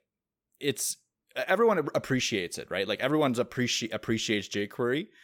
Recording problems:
none

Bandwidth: 17 kHz